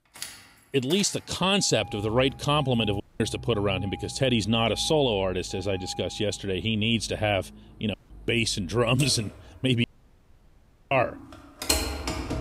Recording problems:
traffic noise; noticeable; throughout; 10 dB below the speech
audio cutting out; at 3 s, at 8 s and at 10 s for 1 s

